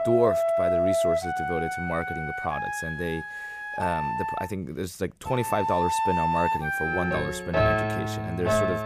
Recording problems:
background music; very loud; throughout; 3 dB above the speech

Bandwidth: 15 kHz